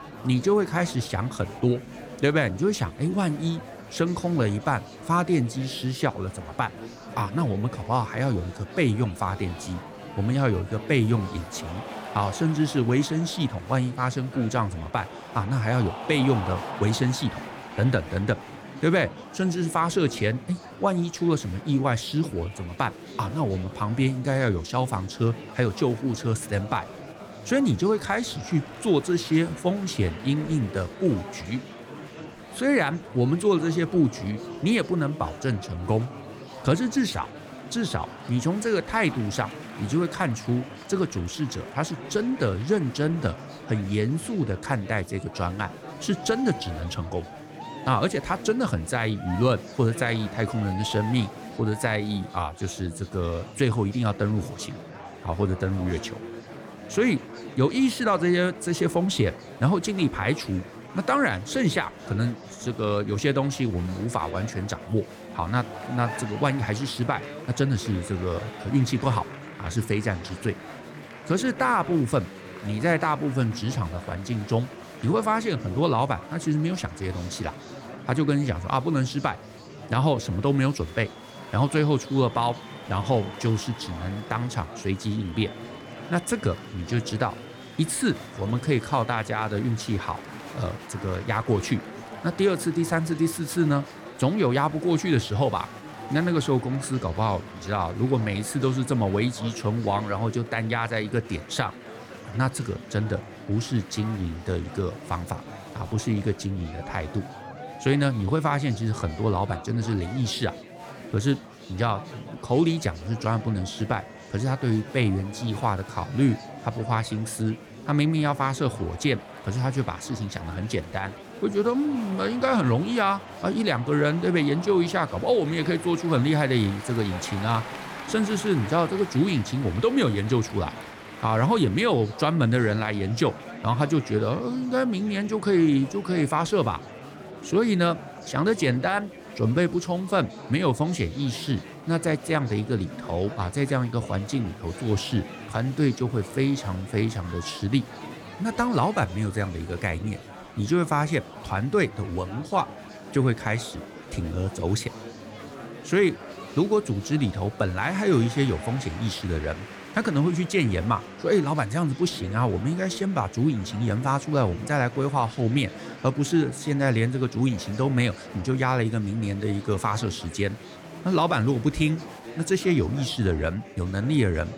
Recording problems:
murmuring crowd; noticeable; throughout; 15 dB below the speech

